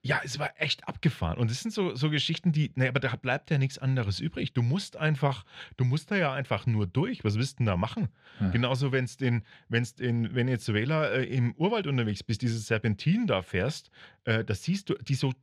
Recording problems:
muffled; slightly; fading above 3 kHz

